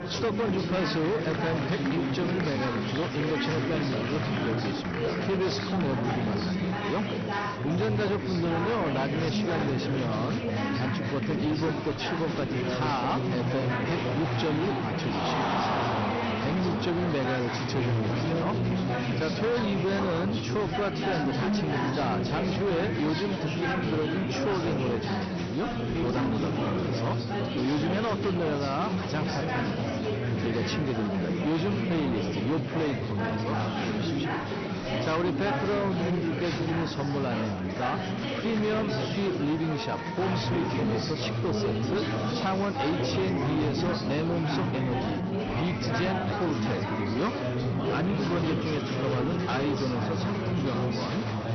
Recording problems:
distortion; slight; 18% of the sound clipped
garbled, watery; slightly; nothing above 6 kHz
chatter from many people; very loud; throughout; 1 dB above the speech

